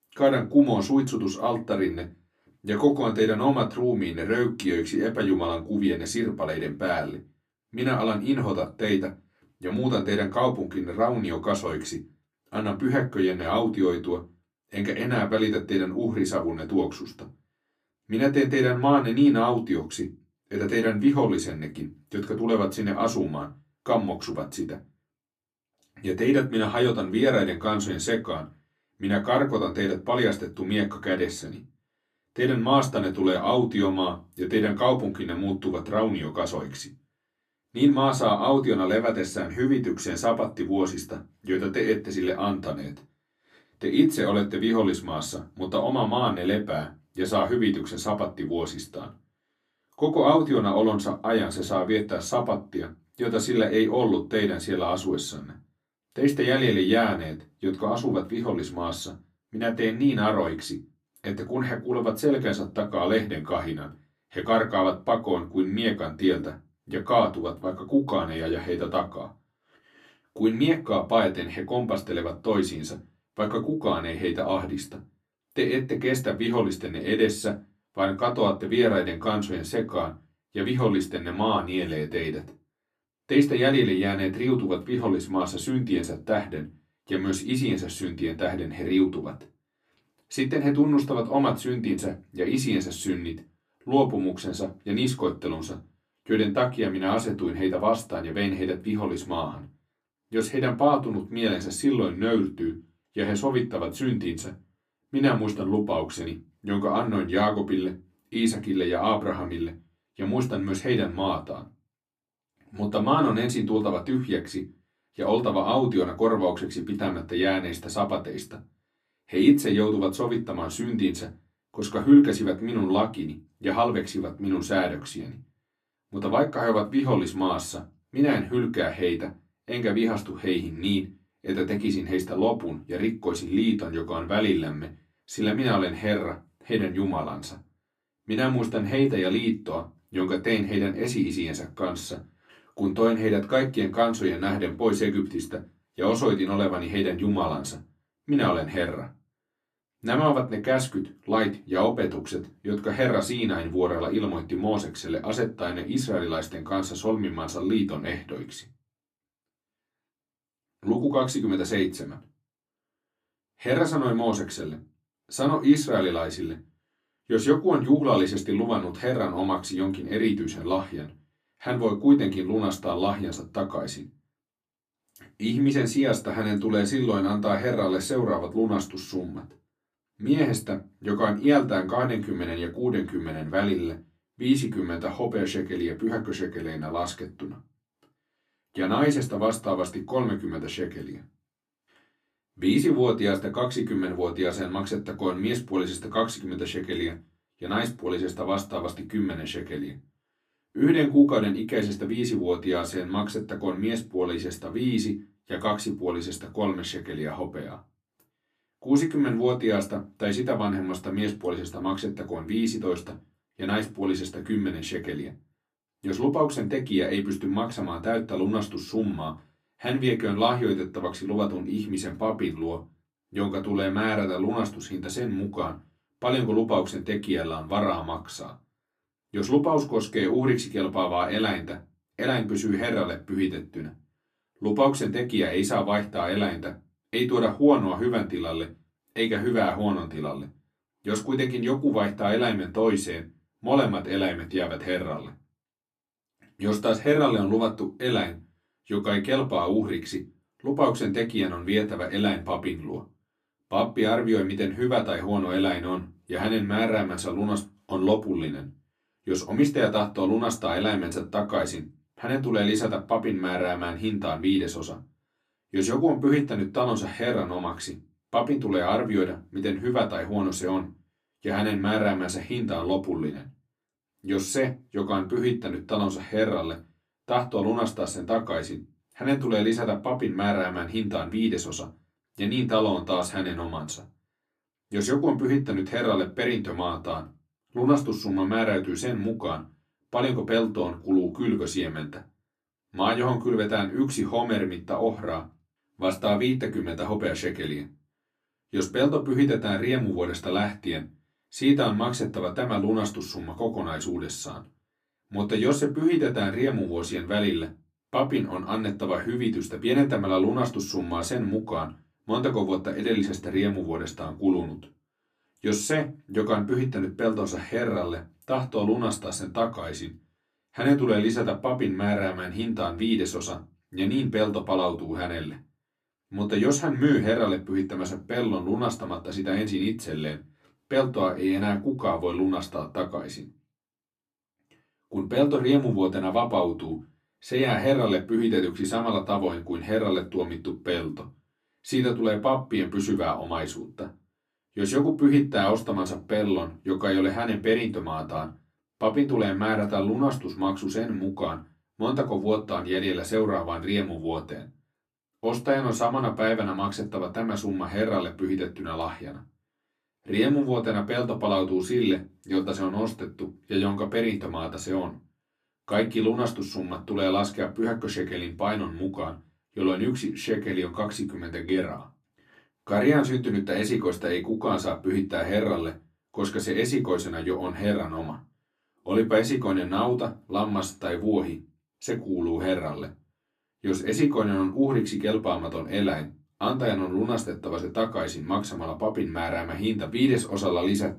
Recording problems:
off-mic speech; far
room echo; very slight; dies away in 0.2 s

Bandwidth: 15 kHz